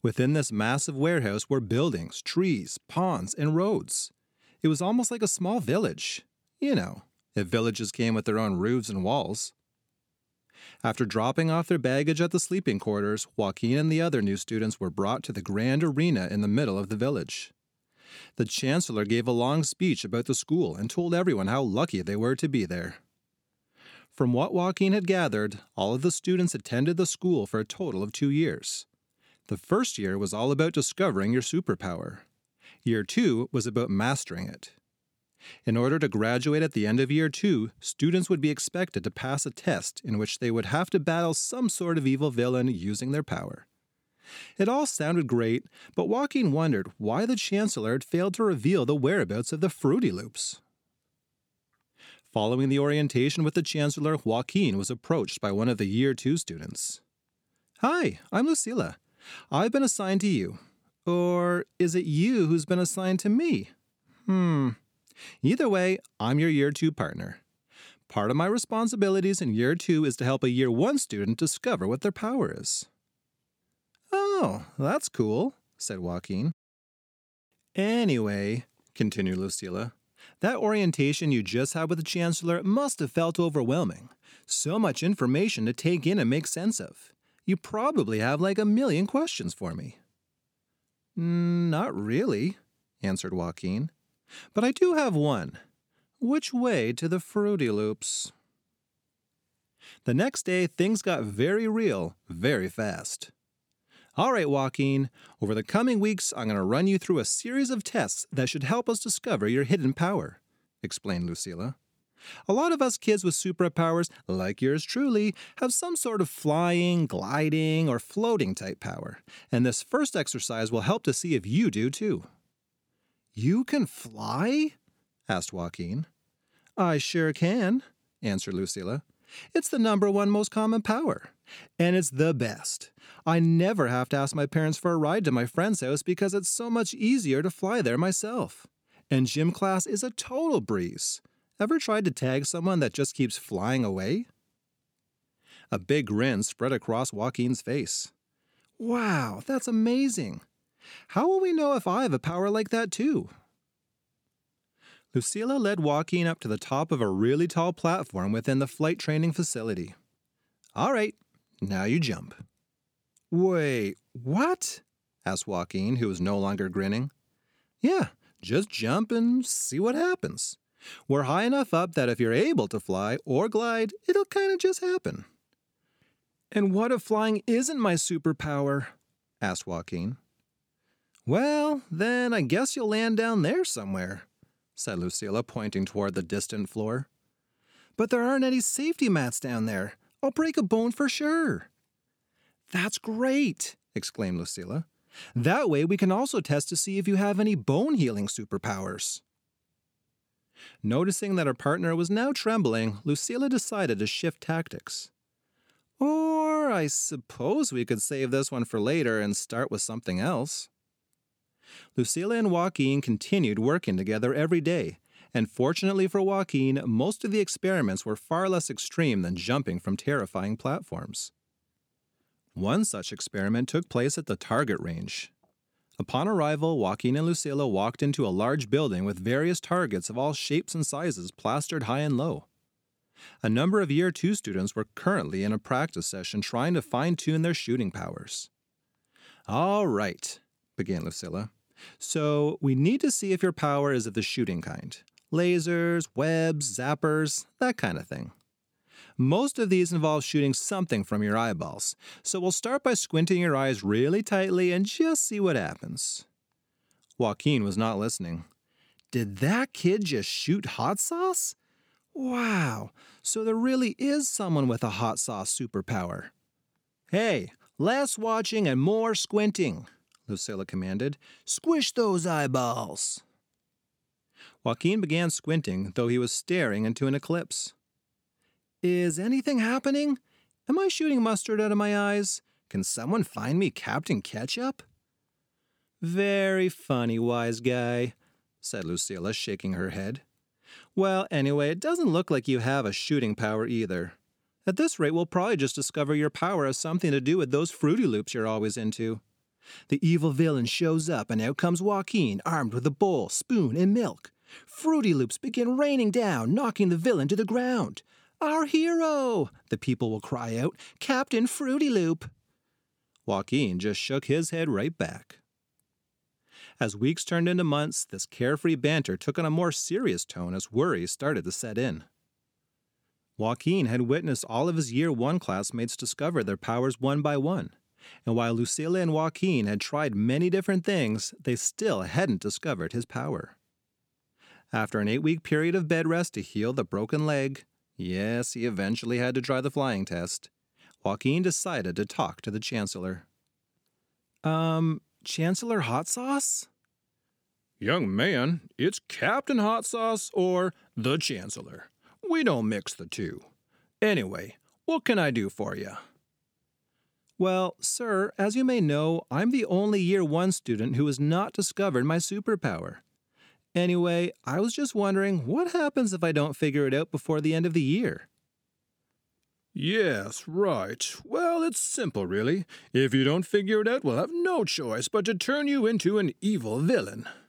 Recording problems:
none

